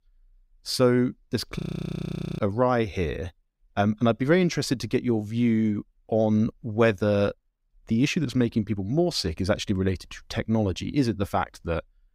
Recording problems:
audio freezing; at 1.5 s for 1 s

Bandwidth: 15.5 kHz